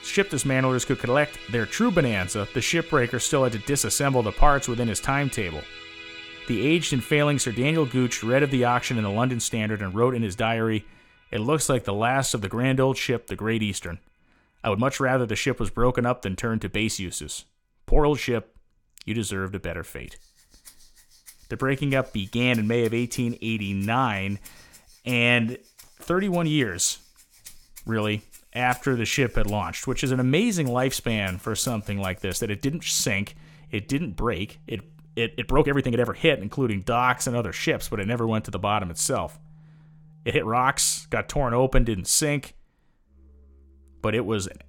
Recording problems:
background music; noticeable; throughout; 20 dB below the speech
uneven, jittery; strongly; from 2.5 to 40 s

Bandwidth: 17 kHz